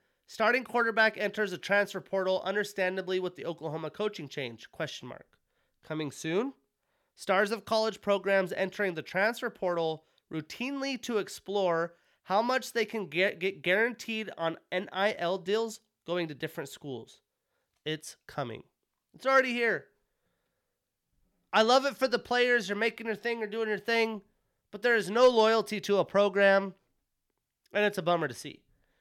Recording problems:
none

